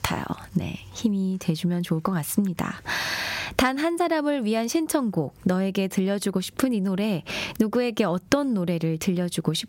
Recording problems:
squashed, flat; heavily

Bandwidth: 16 kHz